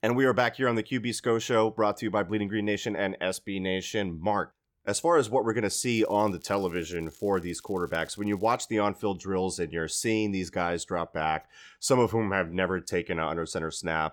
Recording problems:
crackling; faint; from 6 to 8.5 s; 25 dB below the speech

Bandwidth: 17.5 kHz